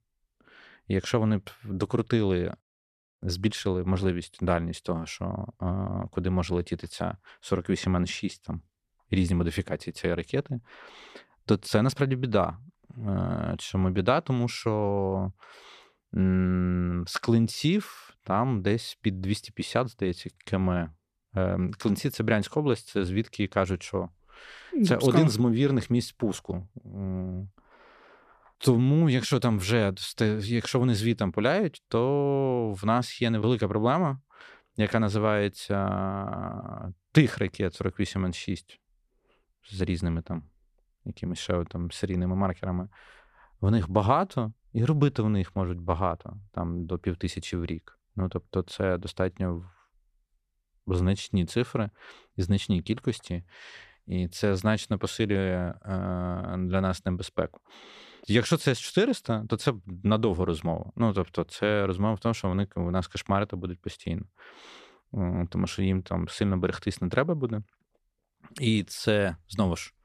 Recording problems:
none

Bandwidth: 14 kHz